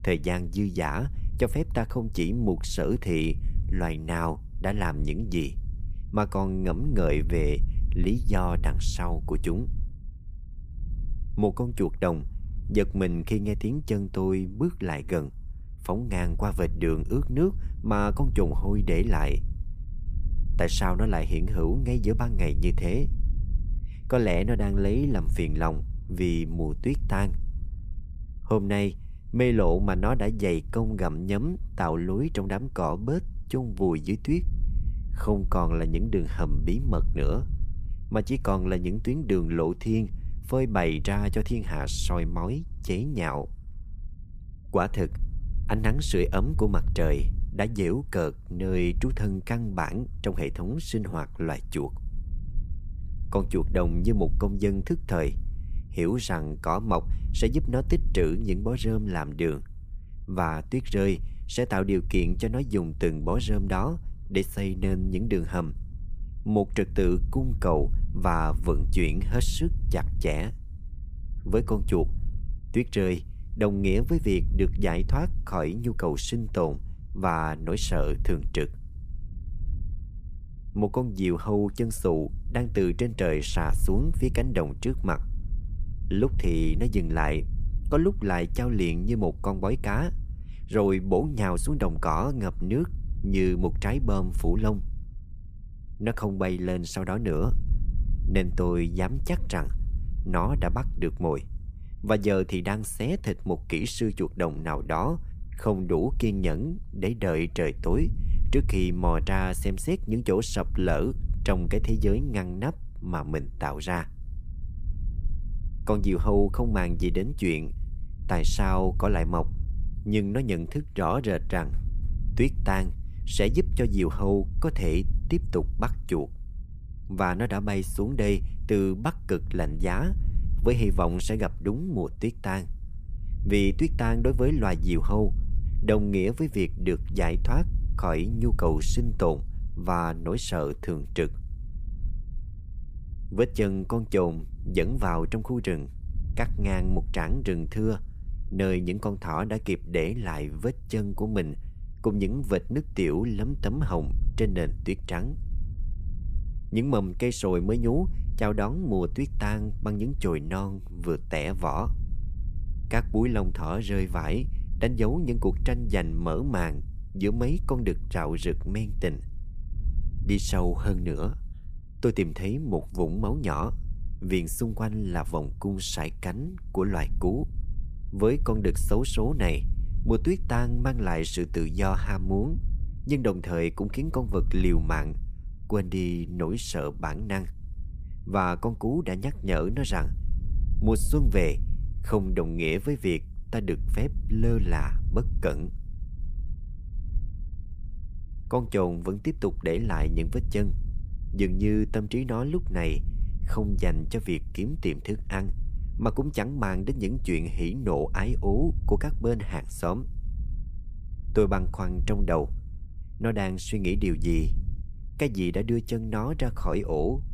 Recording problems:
low rumble; faint; throughout; 20 dB below the speech

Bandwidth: 15 kHz